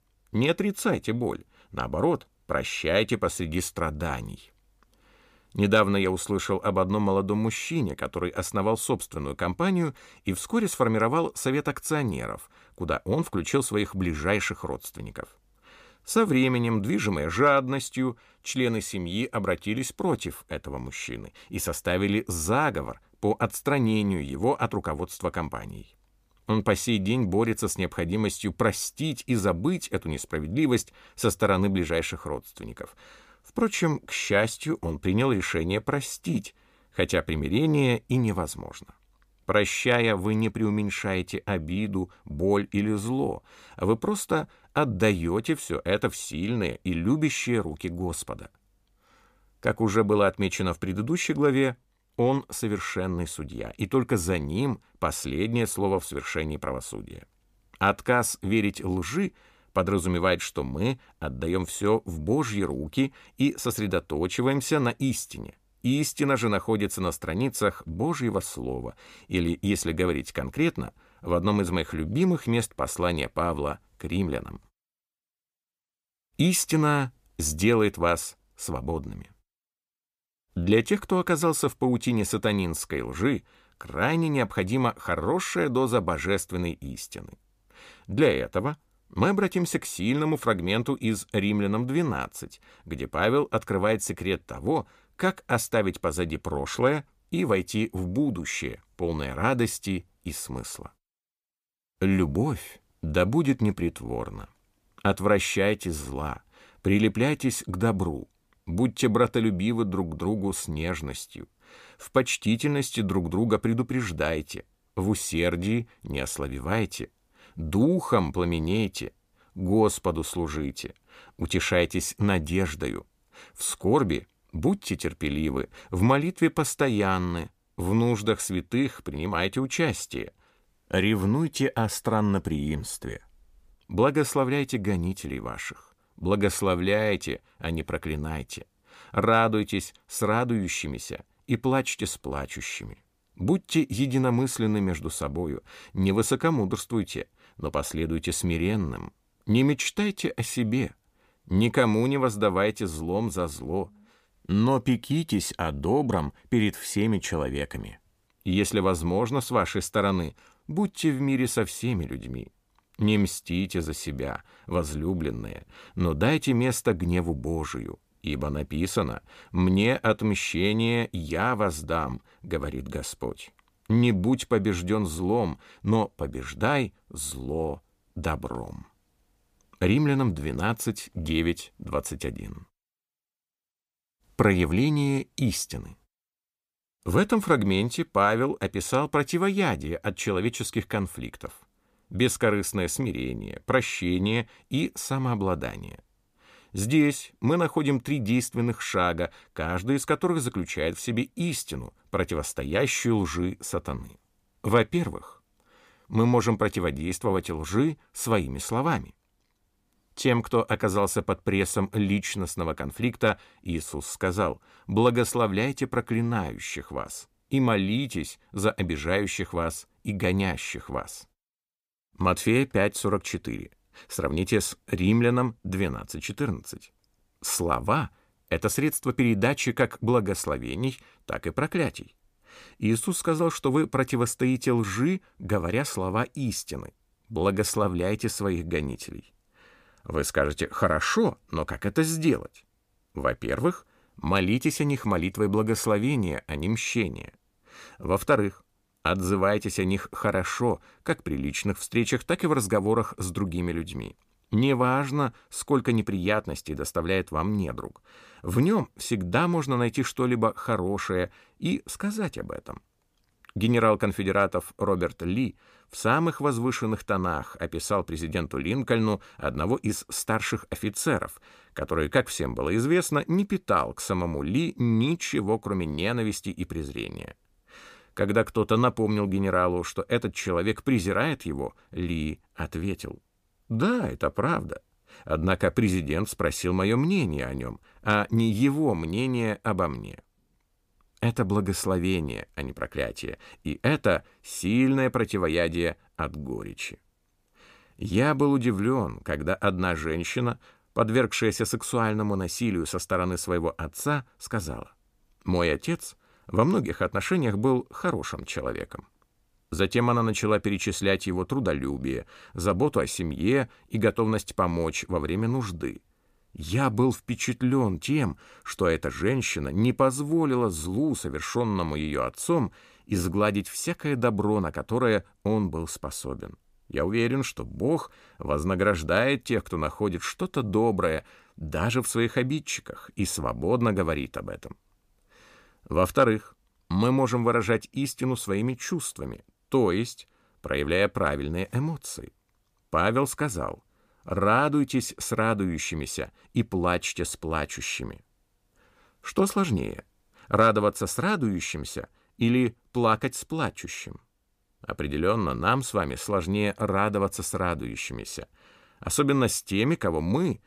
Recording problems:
none

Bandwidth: 15 kHz